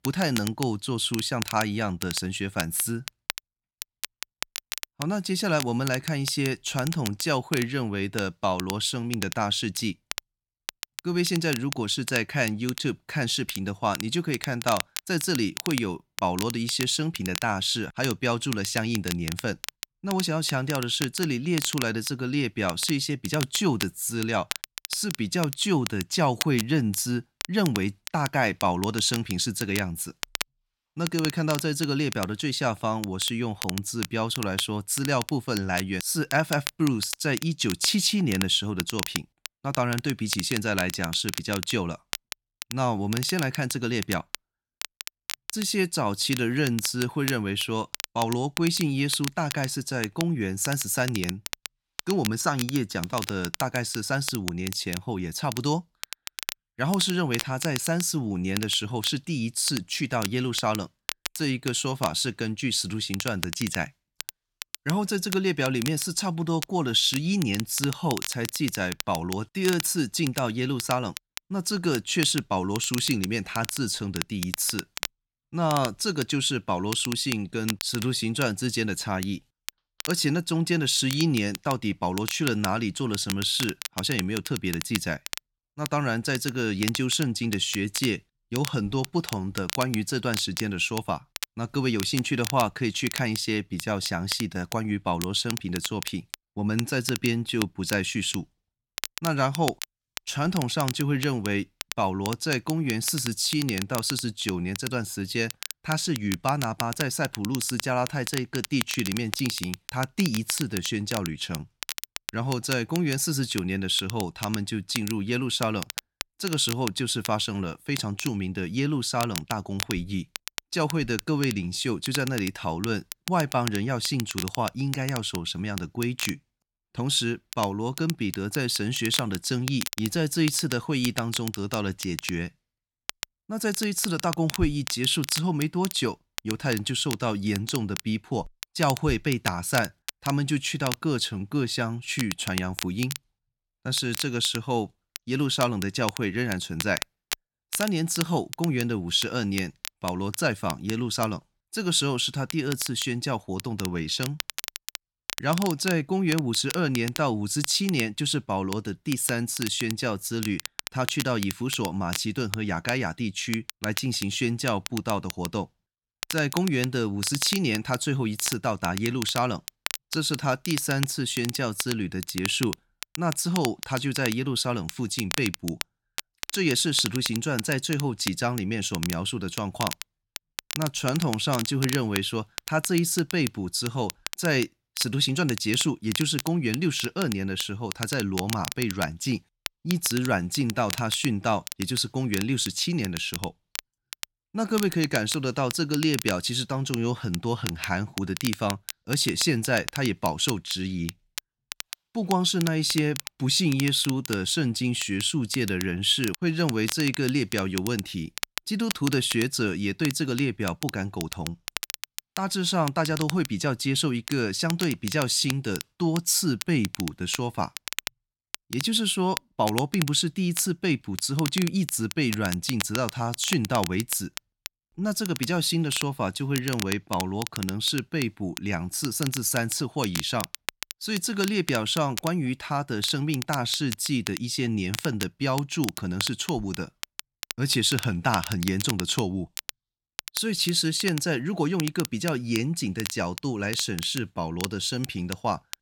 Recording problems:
crackle, like an old record; loud; 9 dB below the speech

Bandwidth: 17 kHz